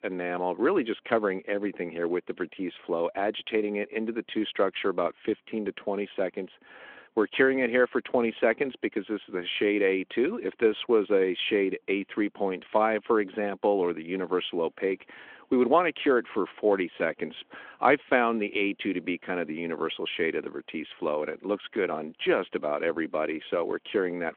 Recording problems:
phone-call audio
traffic noise; very faint; throughout; 45 dB below the speech

